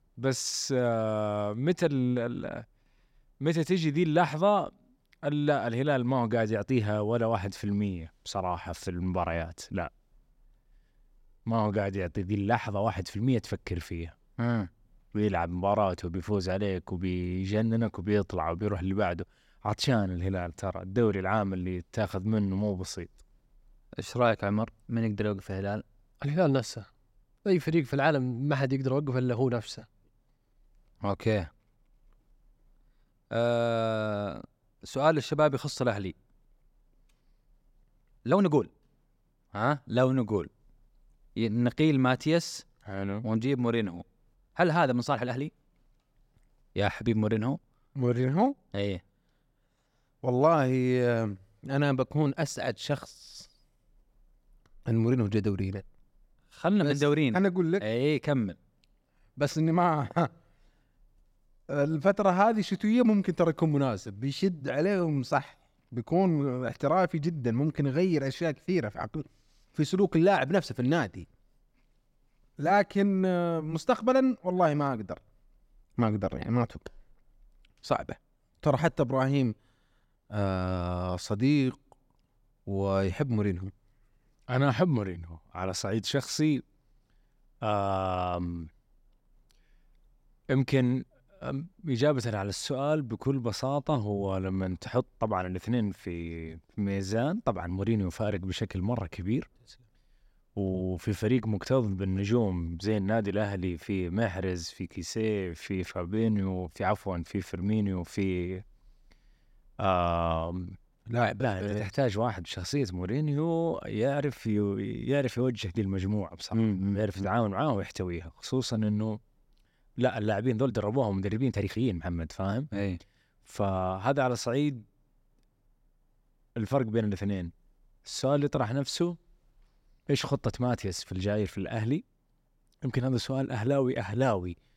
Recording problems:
uneven, jittery; strongly; from 11 s to 2:09

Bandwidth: 16 kHz